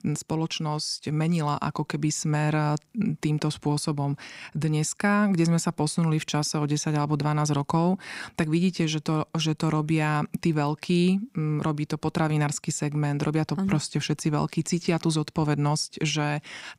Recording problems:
none

